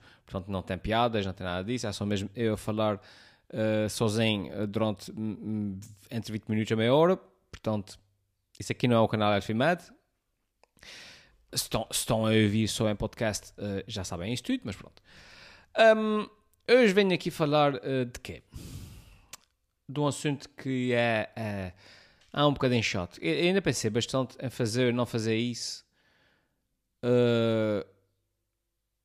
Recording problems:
none

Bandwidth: 15 kHz